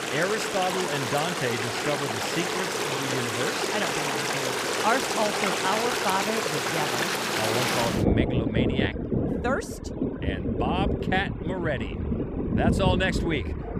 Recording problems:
rain or running water; very loud; throughout; 3 dB above the speech

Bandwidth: 15 kHz